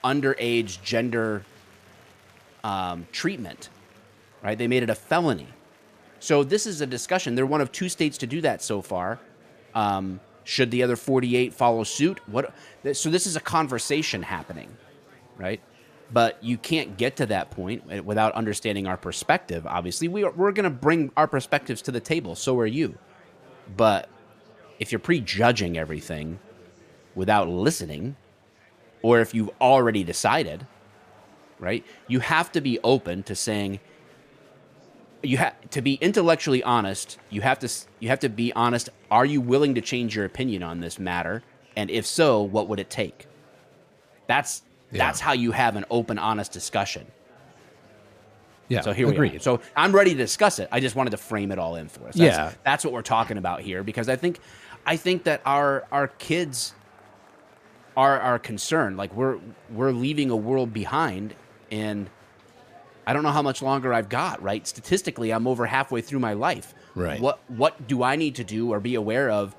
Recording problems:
chatter from many people; faint; throughout; 30 dB below the speech

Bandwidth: 14.5 kHz